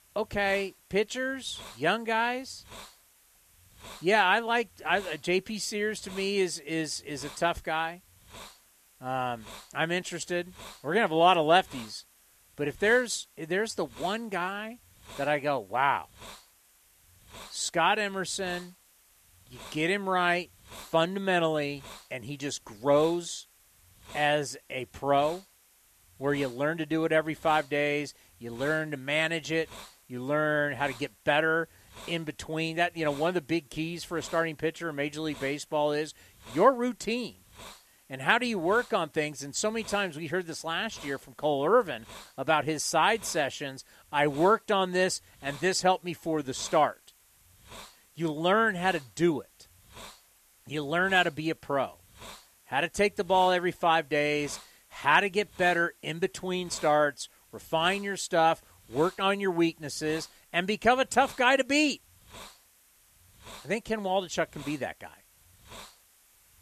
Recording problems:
hiss; faint; throughout; 25 dB below the speech

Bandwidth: 14 kHz